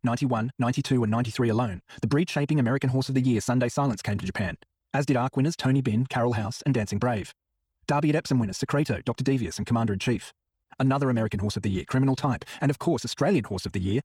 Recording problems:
wrong speed, natural pitch; too fast; 1.5 times normal speed

